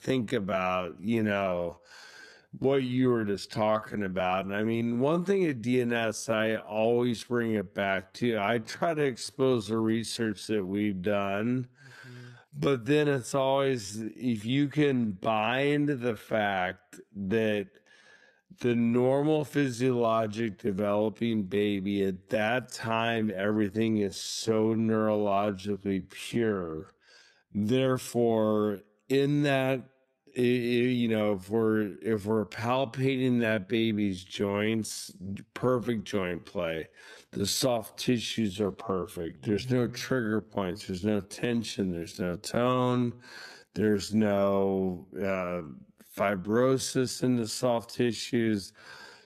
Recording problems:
wrong speed, natural pitch; too slow; 0.6 times normal speed

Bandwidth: 14.5 kHz